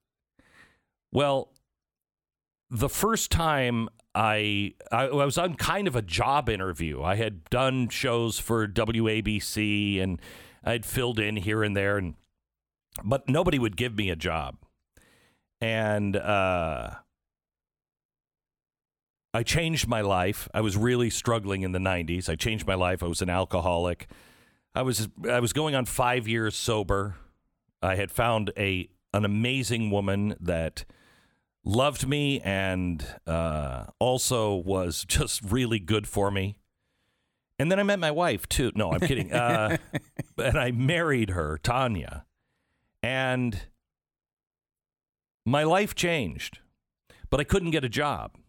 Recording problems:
none

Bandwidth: 18 kHz